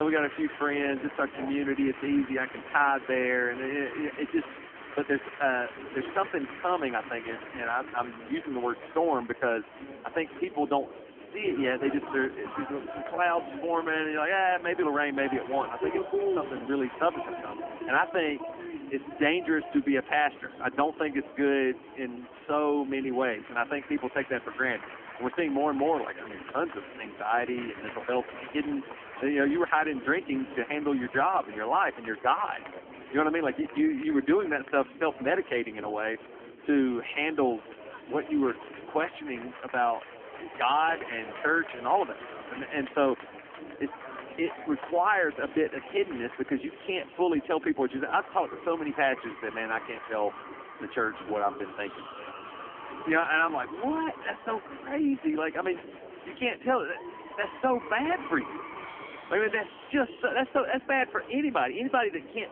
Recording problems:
phone-call audio; poor line; nothing above 3 kHz
chatter from many people; noticeable; throughout; 10 dB below the speech
abrupt cut into speech; at the start

